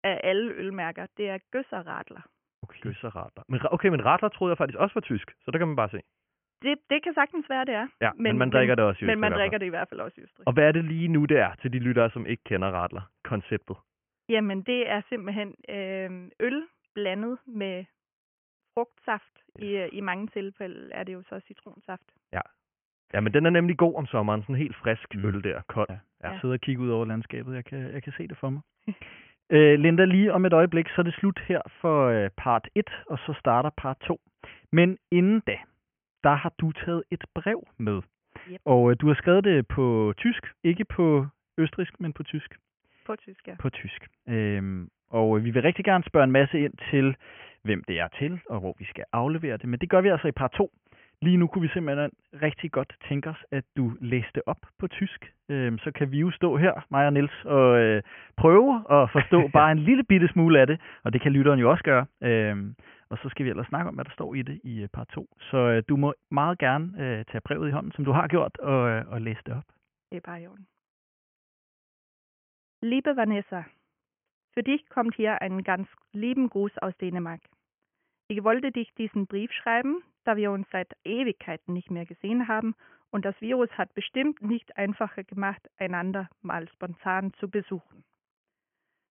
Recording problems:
high frequencies cut off; severe; nothing above 3 kHz

